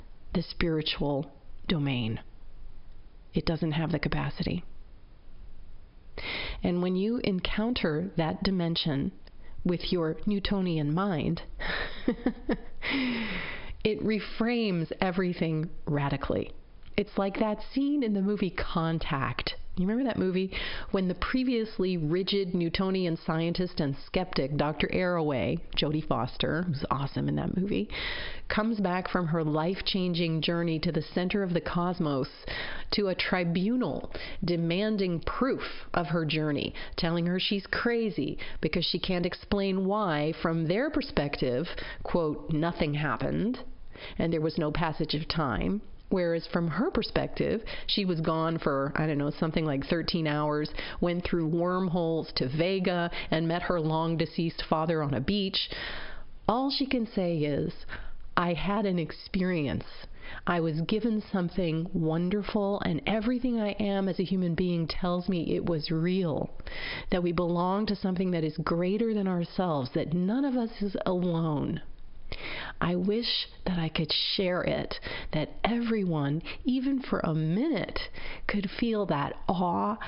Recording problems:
squashed, flat; heavily
high frequencies cut off; noticeable; nothing above 5.5 kHz

